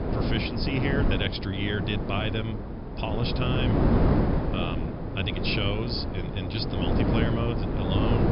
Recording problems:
high frequencies cut off; noticeable; nothing above 5.5 kHz
wind noise on the microphone; heavy; 1 dB below the speech

